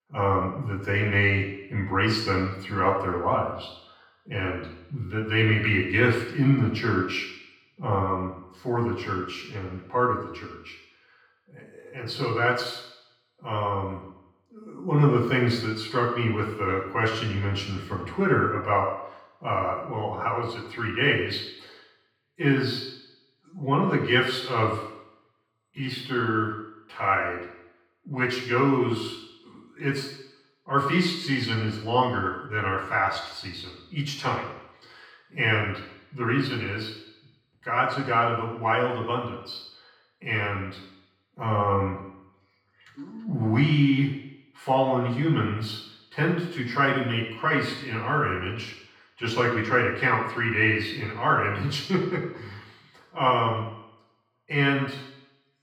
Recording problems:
off-mic speech; far
room echo; noticeable; dies away in 0.9 s

